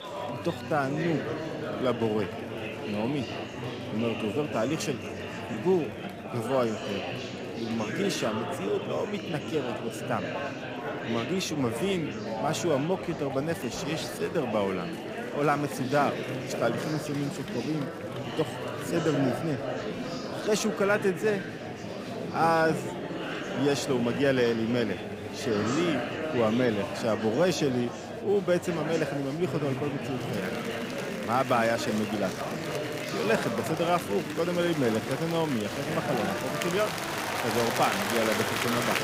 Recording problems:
murmuring crowd; loud; throughout; 4 dB below the speech

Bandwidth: 15.5 kHz